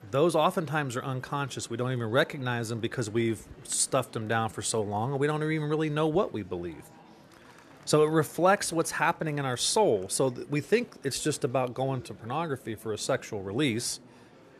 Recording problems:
murmuring crowd; faint; throughout; 25 dB below the speech

